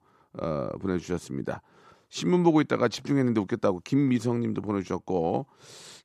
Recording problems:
none

